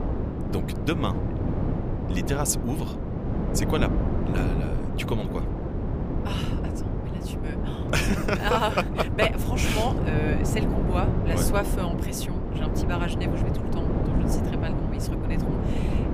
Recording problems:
wind noise on the microphone; heavy; 4 dB below the speech

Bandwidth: 15 kHz